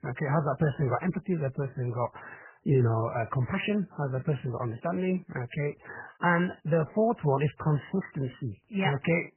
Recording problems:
garbled, watery; badly; nothing above 3 kHz

